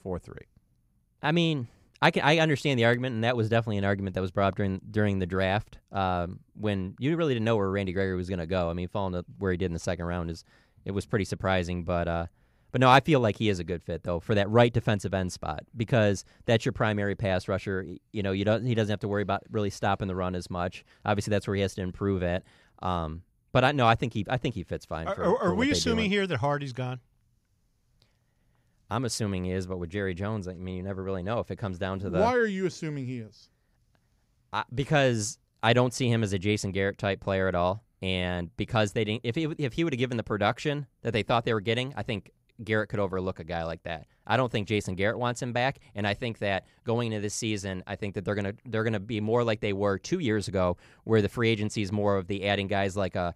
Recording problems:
none

